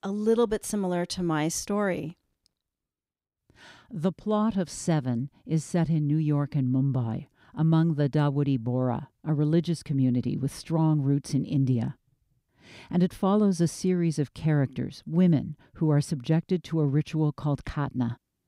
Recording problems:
none

